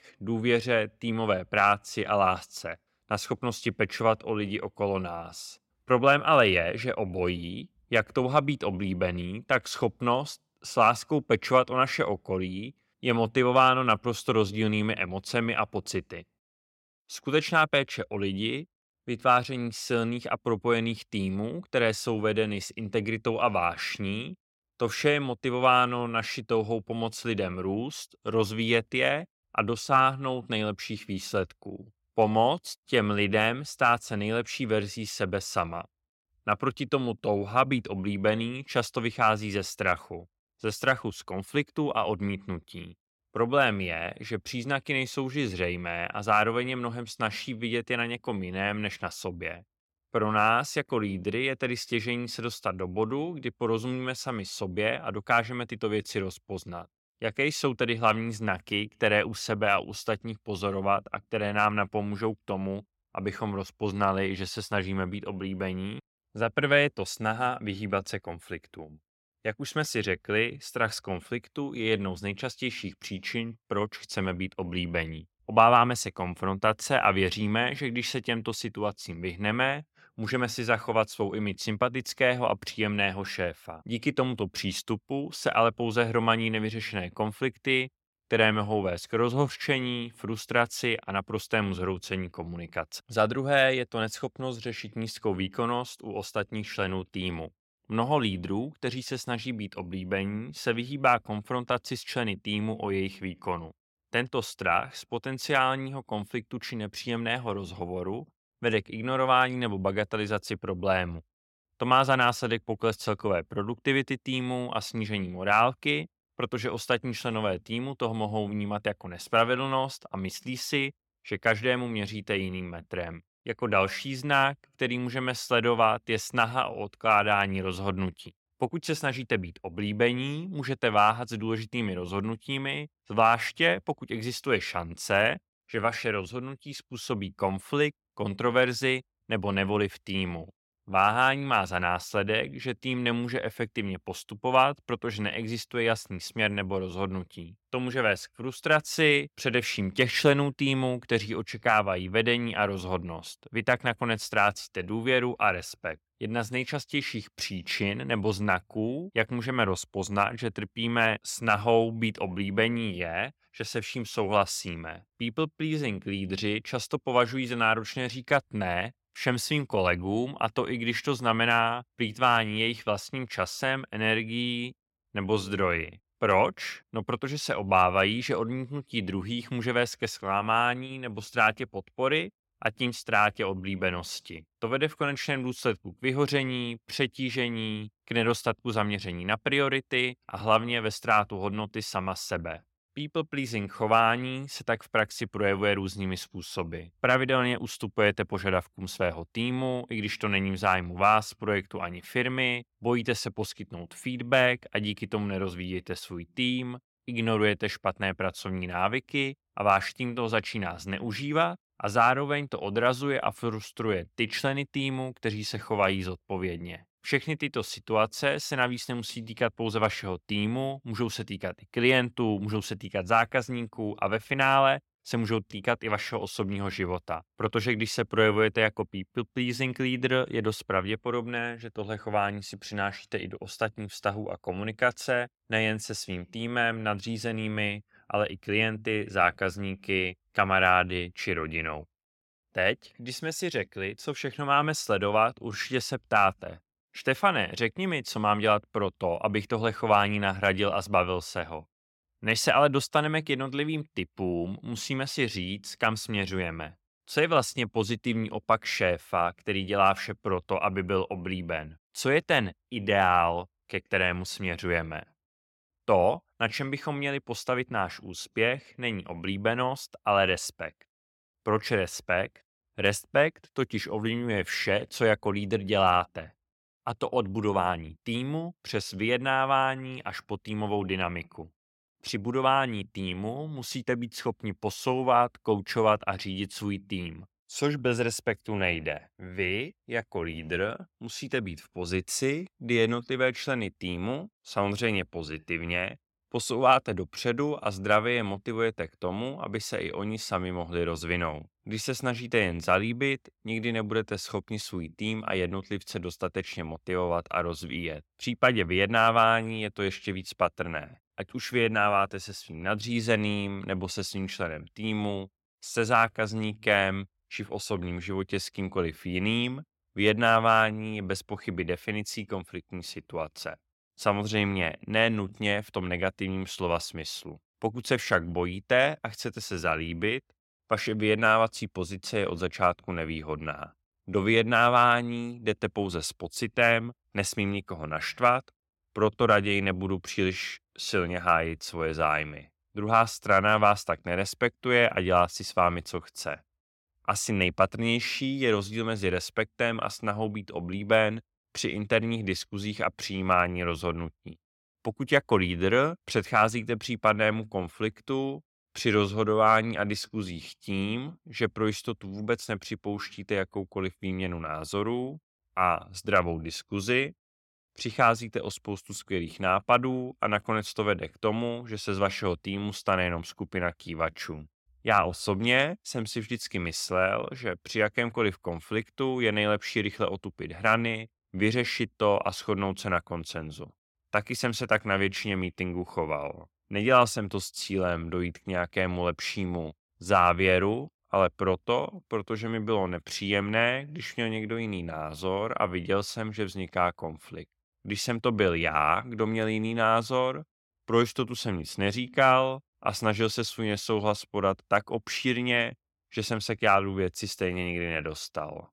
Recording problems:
none

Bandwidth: 16.5 kHz